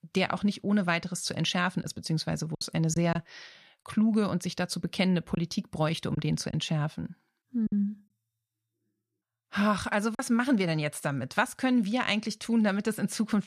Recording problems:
choppy; occasionally; from 2 to 3 s, from 5.5 to 7.5 s and at 10 s; 5% of the speech affected

